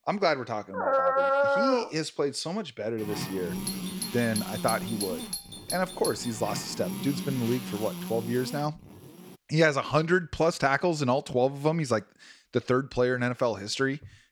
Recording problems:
electrical hum; noticeable; from 3 to 9.5 s; 50 Hz, 10 dB below the speech
dog barking; loud; from 0.5 to 2 s; peak 5 dB above the speech
doorbell; noticeable; from 3.5 to 6.5 s; peak 5 dB below the speech

